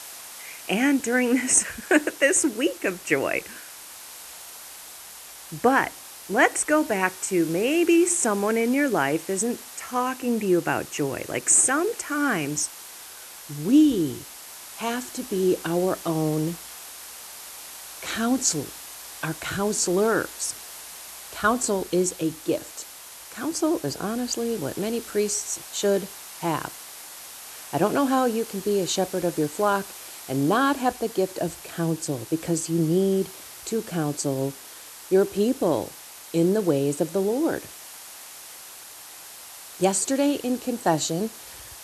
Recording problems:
hiss; noticeable; throughout; 15 dB below the speech

